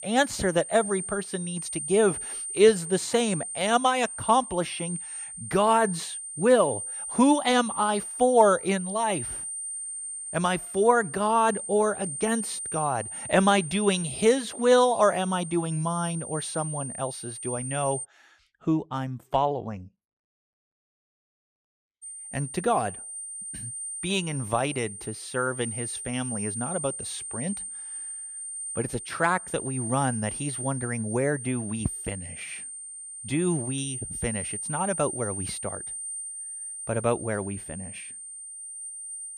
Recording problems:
high-pitched whine; loud; until 18 s and from 22 s on; 9 kHz, 7 dB below the speech

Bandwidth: 14.5 kHz